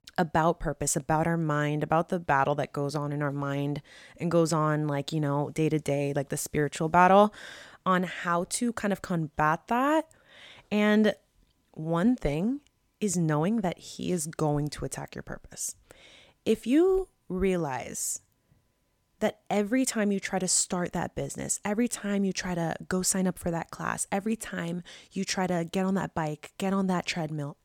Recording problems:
none

